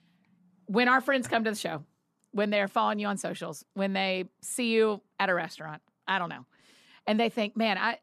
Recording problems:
none

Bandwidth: 13.5 kHz